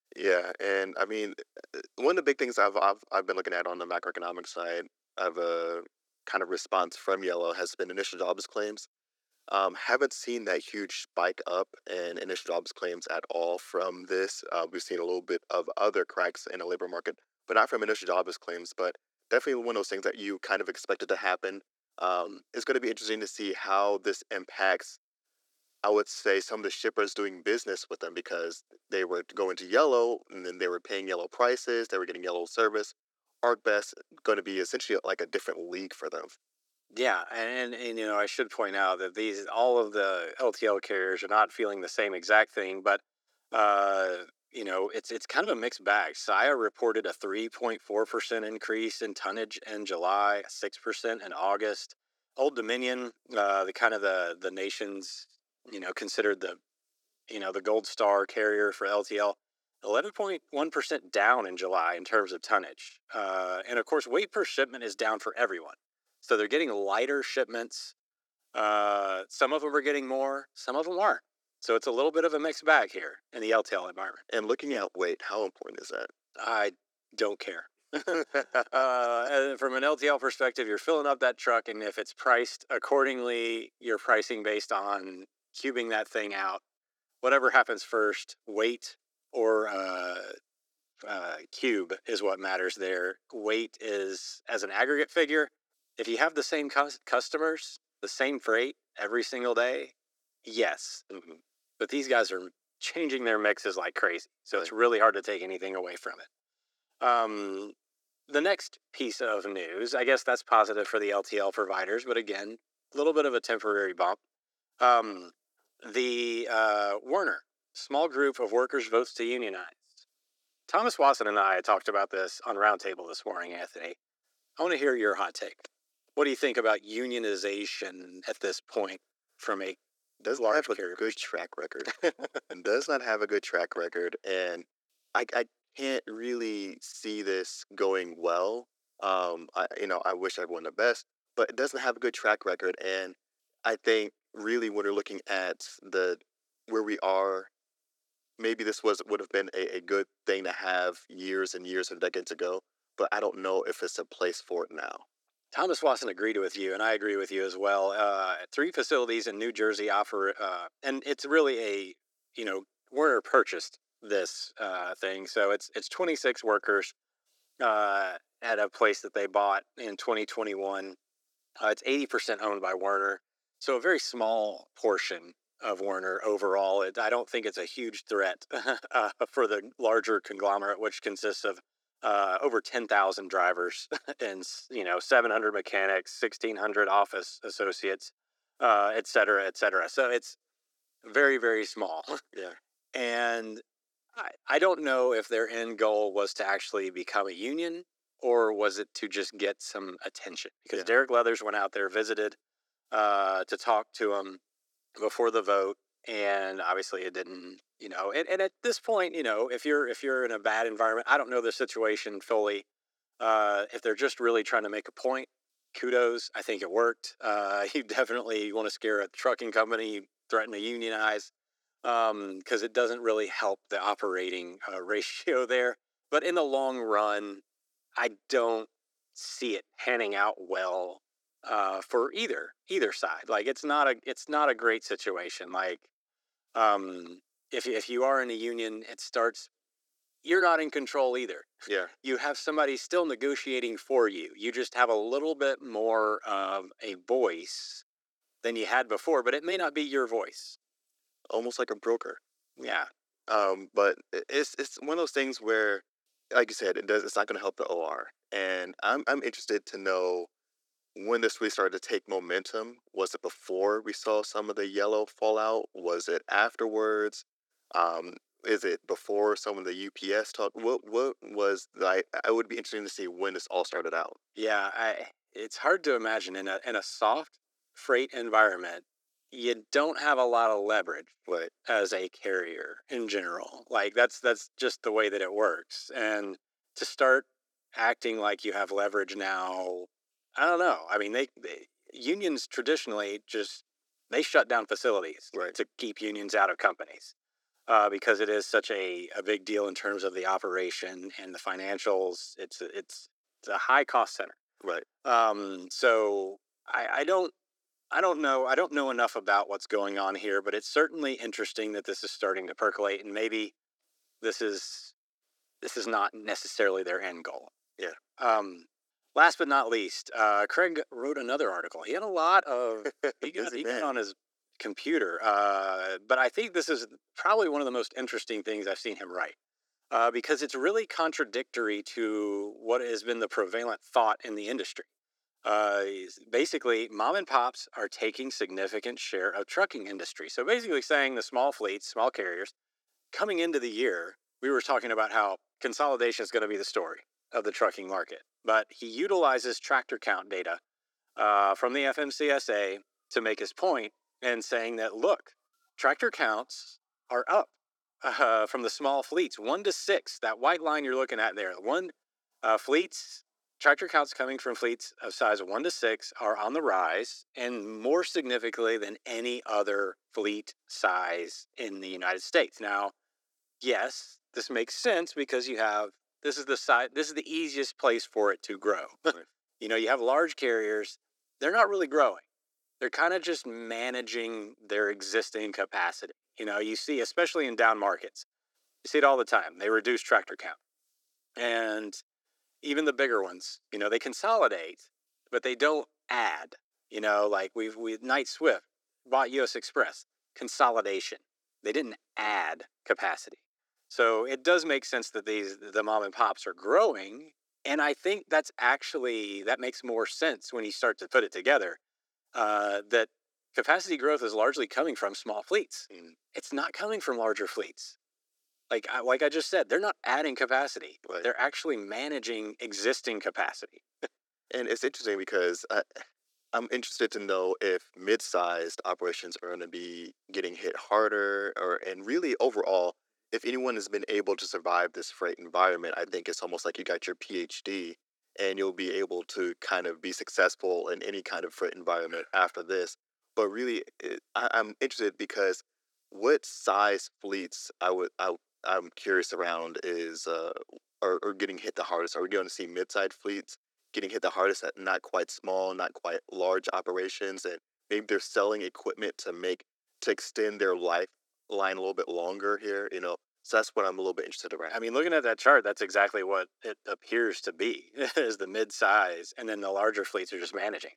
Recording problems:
thin; very; fading below 350 Hz

